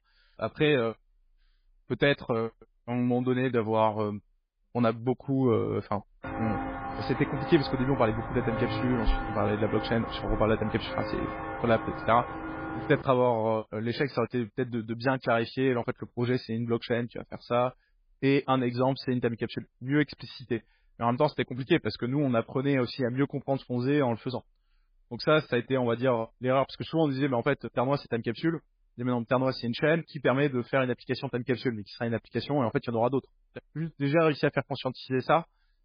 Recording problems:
garbled, watery; badly
footsteps; noticeable; from 6 to 13 s; peak 3 dB below the speech

